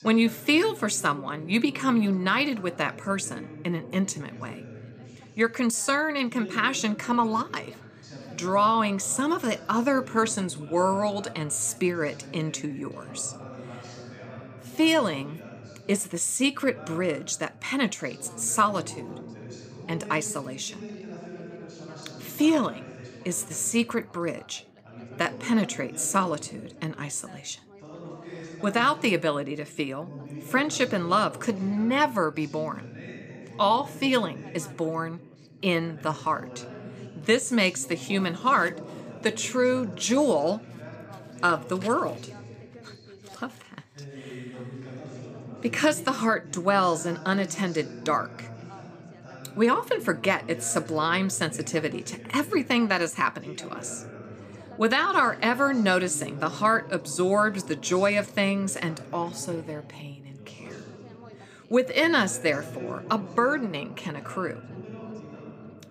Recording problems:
background chatter; noticeable; throughout; 2 voices, 15 dB below the speech

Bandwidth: 15 kHz